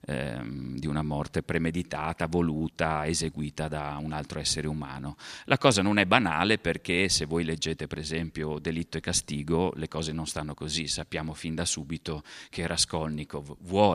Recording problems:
abrupt cut into speech; at the end

